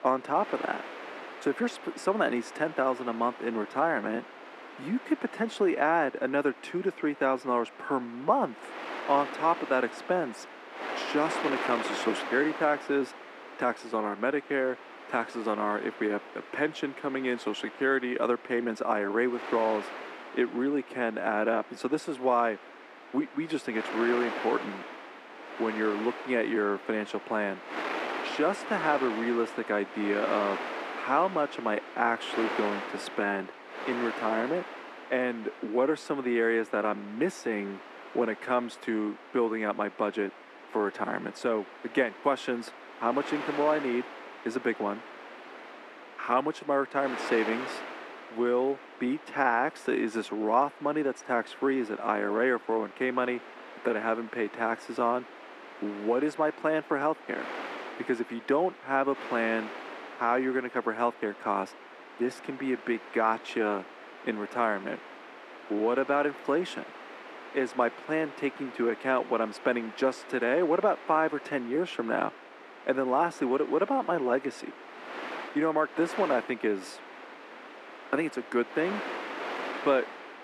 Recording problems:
muffled; very; fading above 3 kHz
thin; somewhat; fading below 250 Hz
wind noise on the microphone; occasional gusts; 10 dB below the speech

